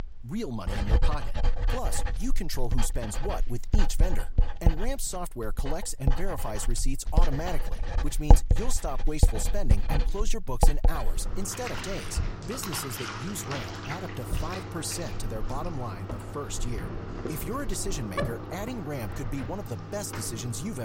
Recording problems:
household noises; very loud; throughout; 3 dB above the speech
abrupt cut into speech; at the end

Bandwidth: 16 kHz